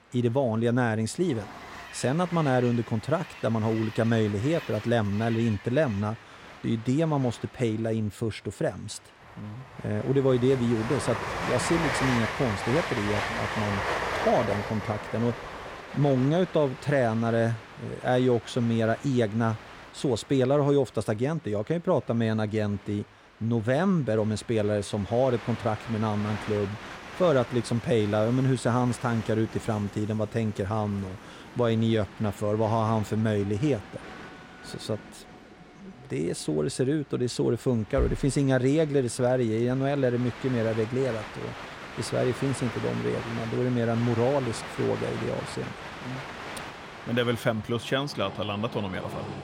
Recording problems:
train or aircraft noise; noticeable; throughout; 10 dB below the speech

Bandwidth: 16 kHz